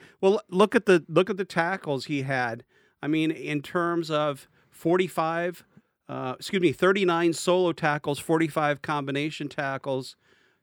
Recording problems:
none

